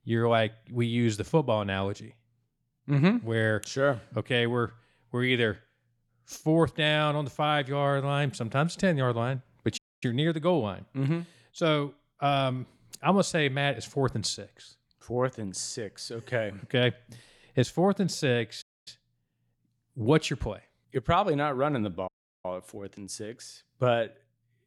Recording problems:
audio cutting out; at 10 s, at 19 s and at 22 s

